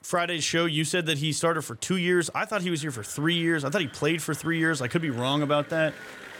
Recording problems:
echo of what is said; faint; from 2.5 s on; 560 ms later, 20 dB below the speech
crowd noise; faint; throughout; 25 dB below the speech

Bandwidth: 18.5 kHz